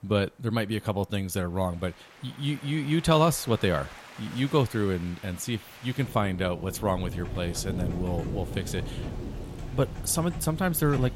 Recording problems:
rain or running water; noticeable; throughout; 10 dB below the speech
keyboard typing; faint; from 7 s on; peak 10 dB below the speech

